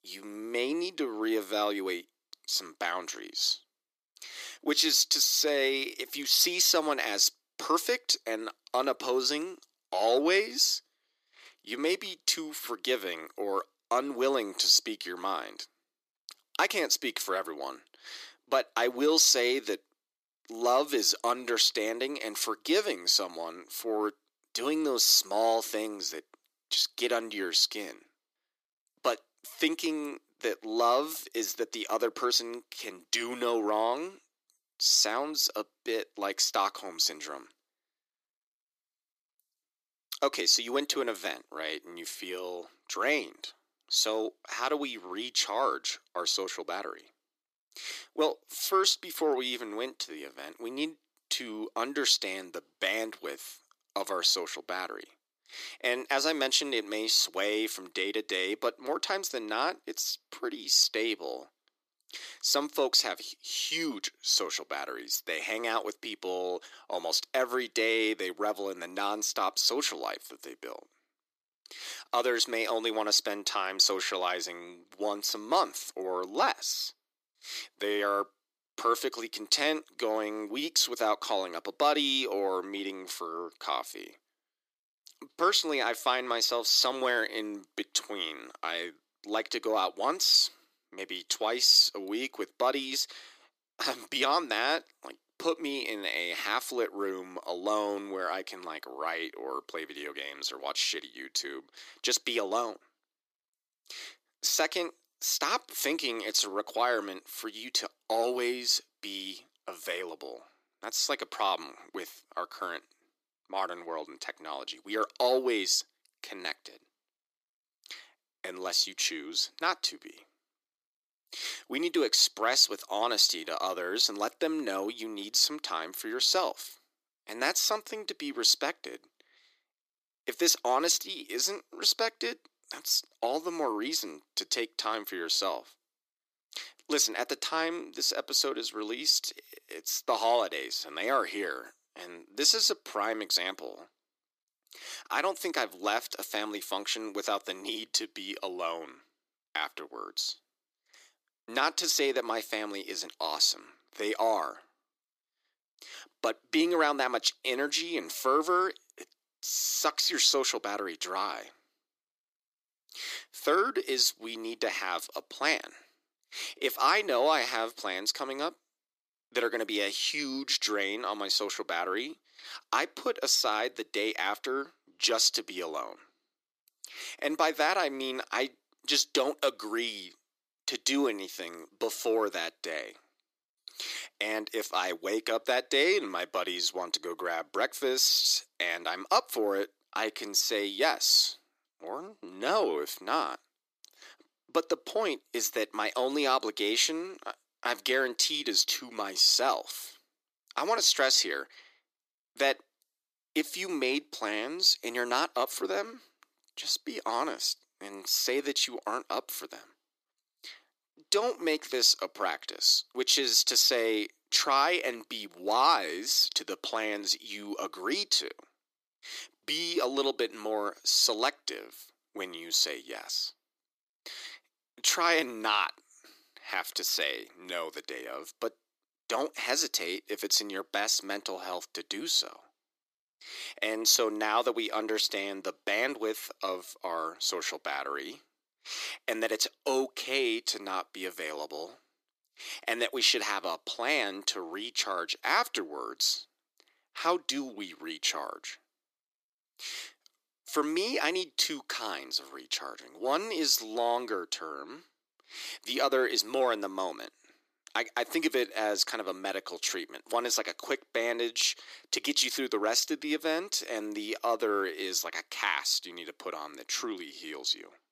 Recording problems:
thin; very; fading below 300 Hz

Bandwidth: 14.5 kHz